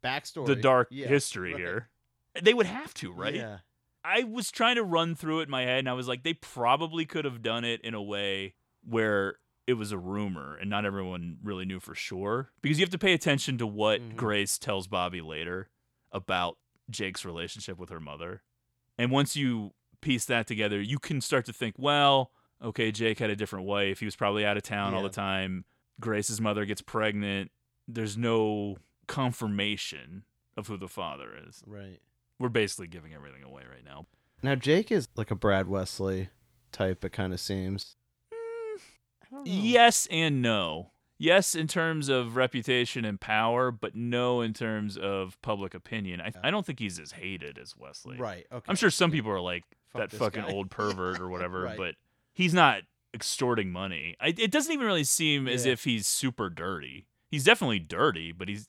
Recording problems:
none

